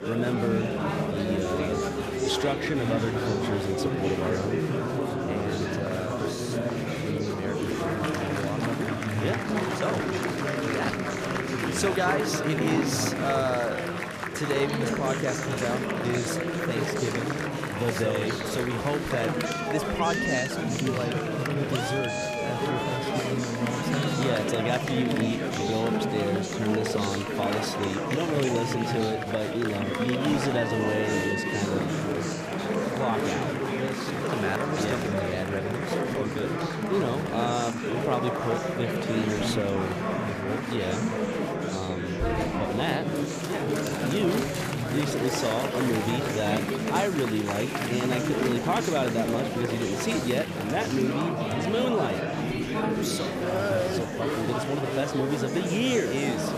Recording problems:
murmuring crowd; very loud; throughout; 2 dB above the speech

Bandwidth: 14.5 kHz